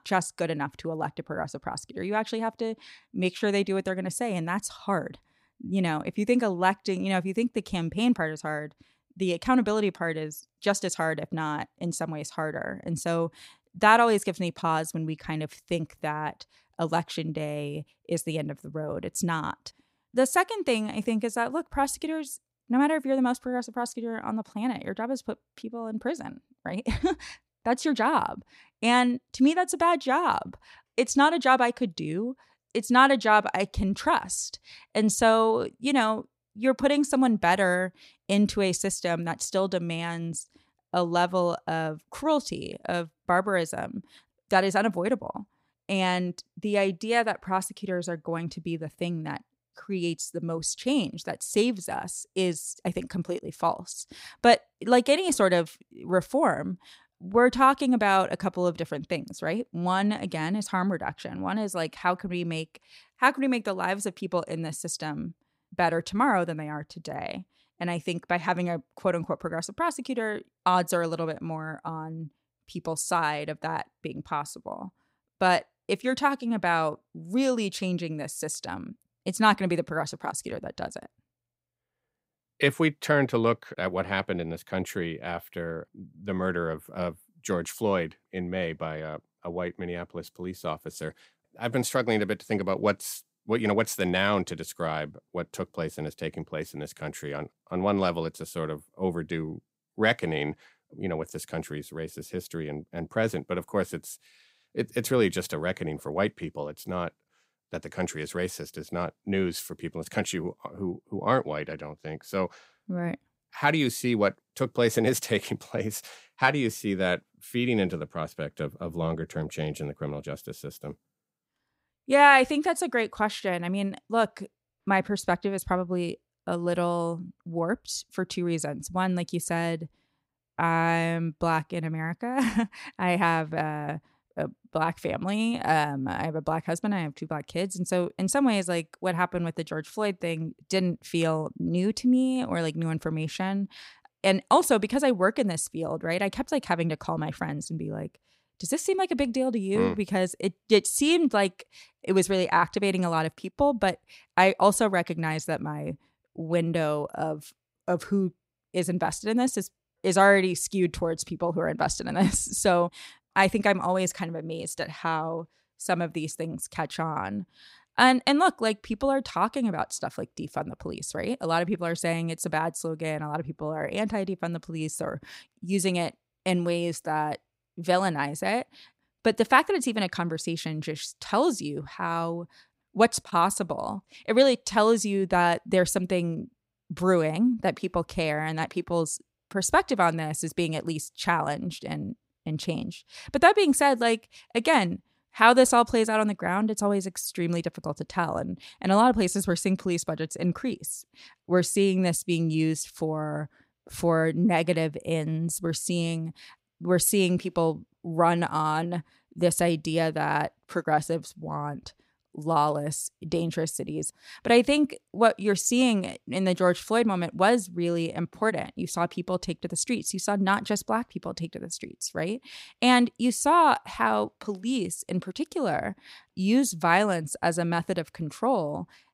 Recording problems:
none

